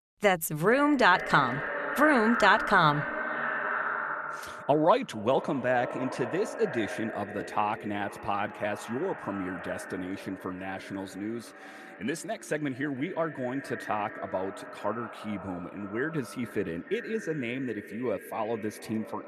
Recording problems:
echo of what is said; strong; throughout; 440 ms later, 7 dB below the speech

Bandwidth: 13.5 kHz